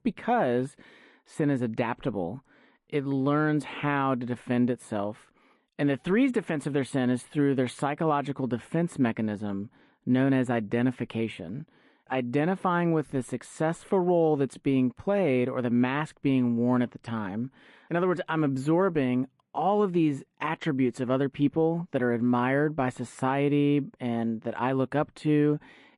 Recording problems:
muffled; slightly; fading above 3.5 kHz
garbled, watery; slightly; nothing above 11 kHz

